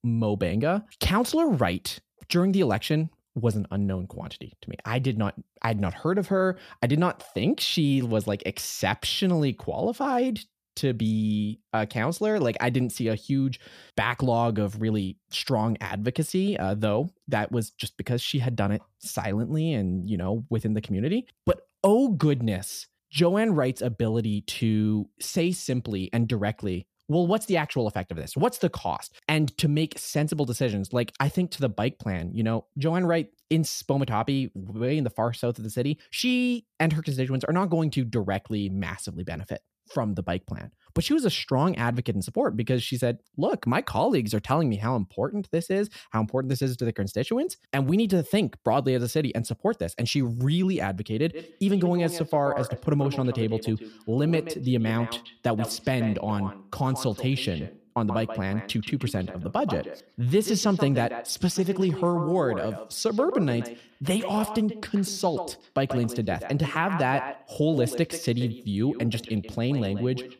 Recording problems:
echo of what is said; strong; from 51 s on; 130 ms later, 10 dB below the speech

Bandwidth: 14.5 kHz